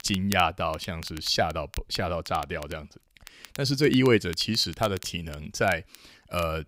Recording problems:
crackle, like an old record; noticeable; 20 dB below the speech

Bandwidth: 15.5 kHz